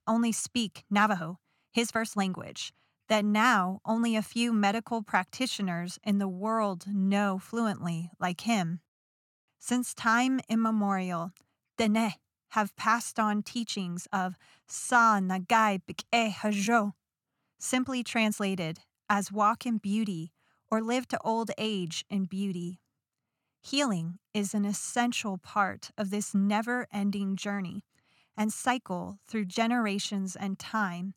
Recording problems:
uneven, jittery; strongly; from 0.5 to 30 s

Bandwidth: 17 kHz